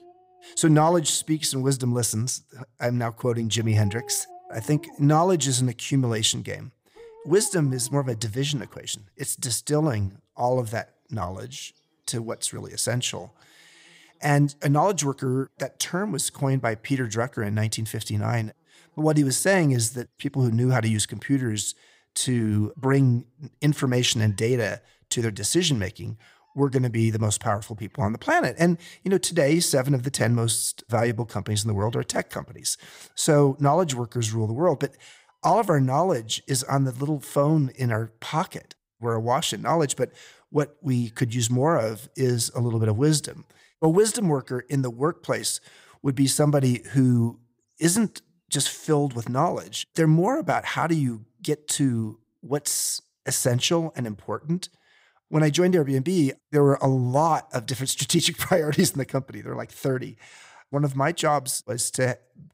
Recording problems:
animal sounds; faint; throughout; 30 dB below the speech

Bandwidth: 15.5 kHz